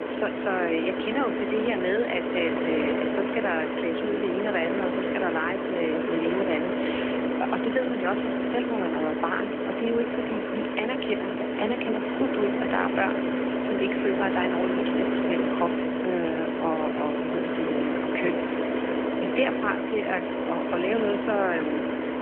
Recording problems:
phone-call audio; nothing above 3 kHz
traffic noise; very loud; throughout; 2 dB above the speech

